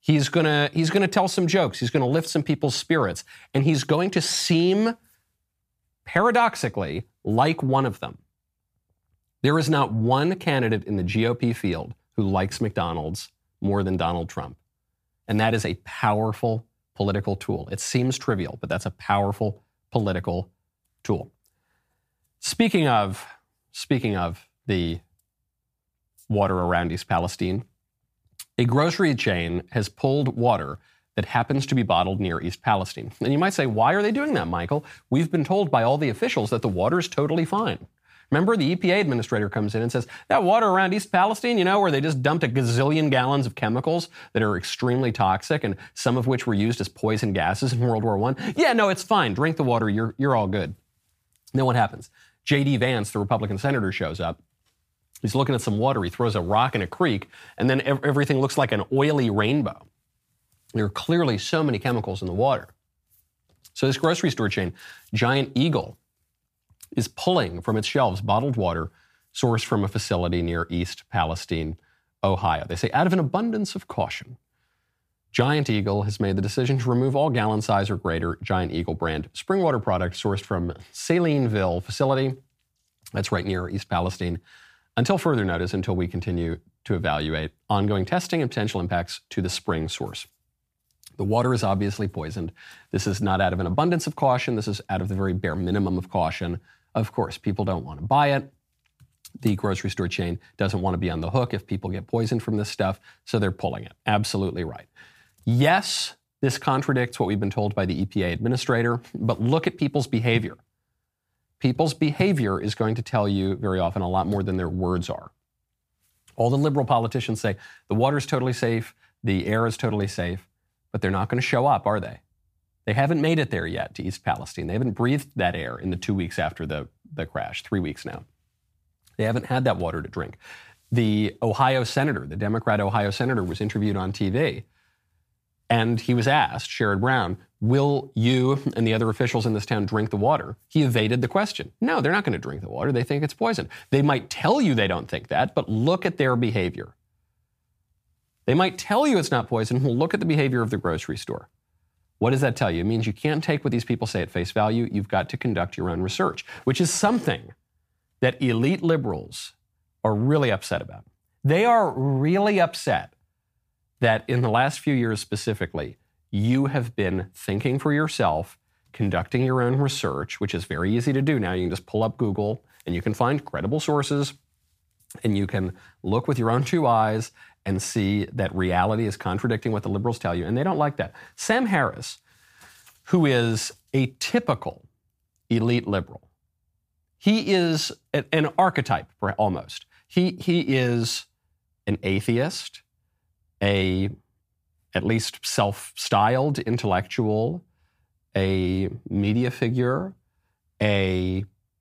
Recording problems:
none

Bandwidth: 15 kHz